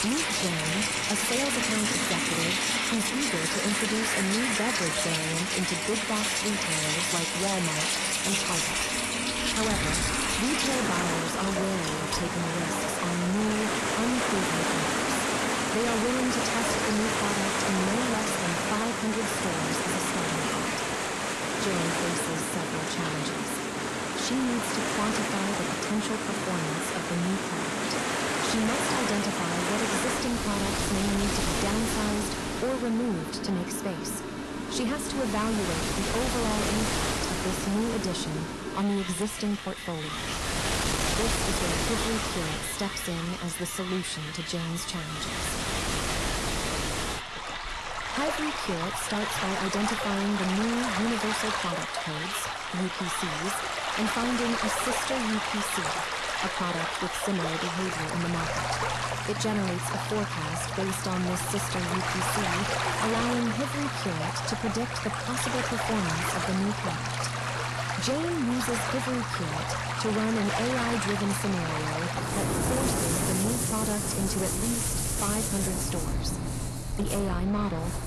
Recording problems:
distortion; slight; 14% of the sound clipped
garbled, watery; slightly; nothing above 12 kHz
rain or running water; very loud; throughout; 2 dB above the speech
machinery noise; loud; throughout; 6 dB below the speech

